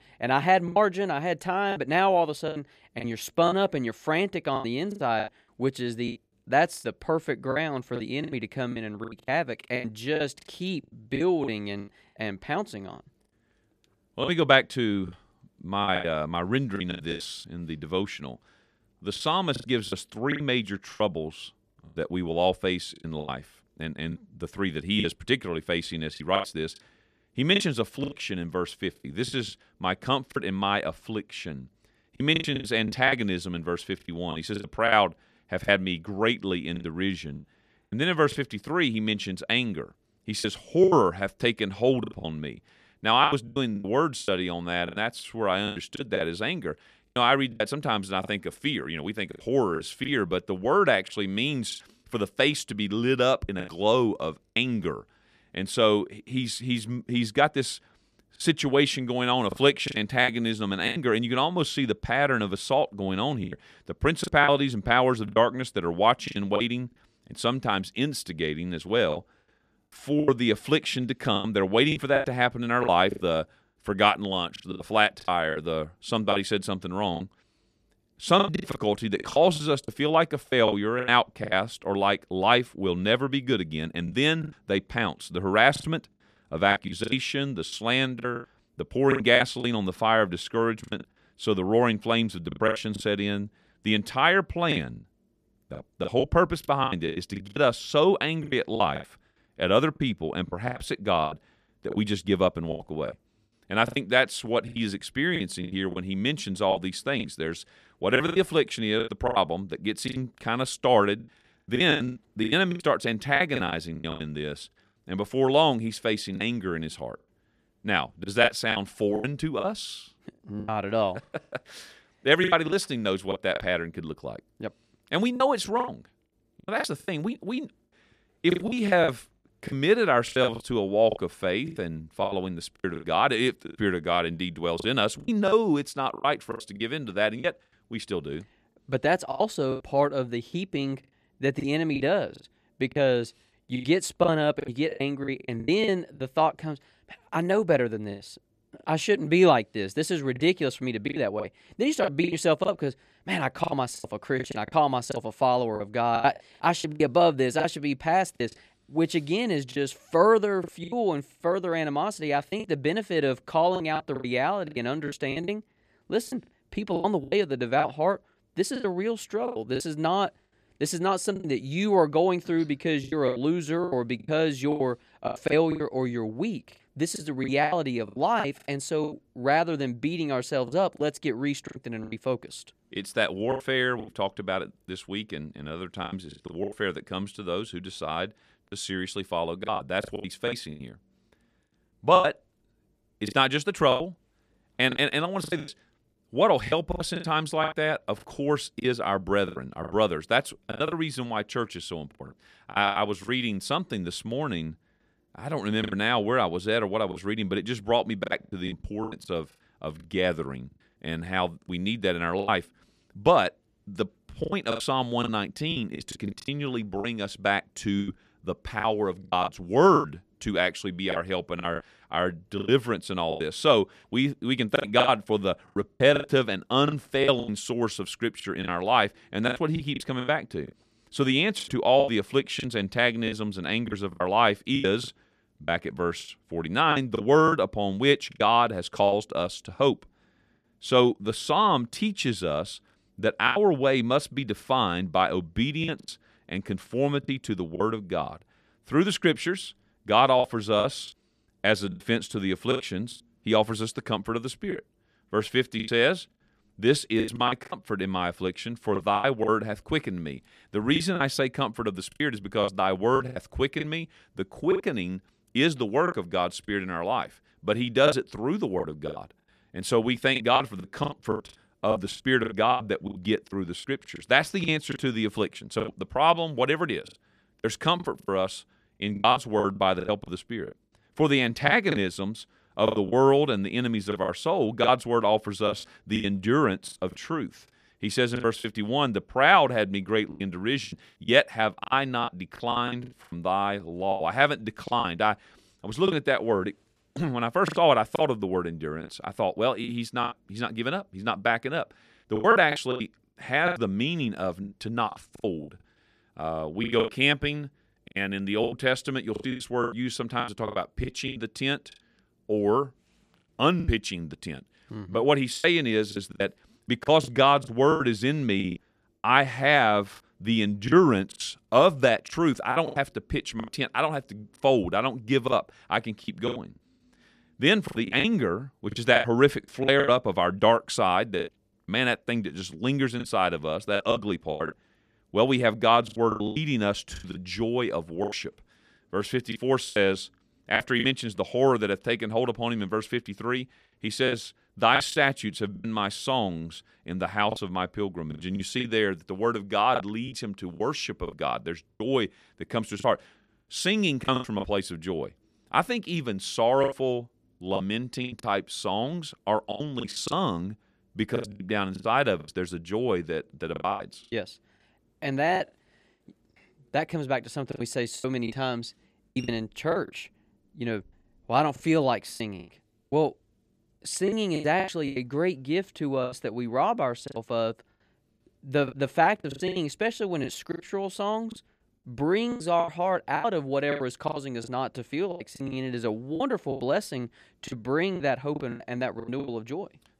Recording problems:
choppy; very; 11% of the speech affected

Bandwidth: 14.5 kHz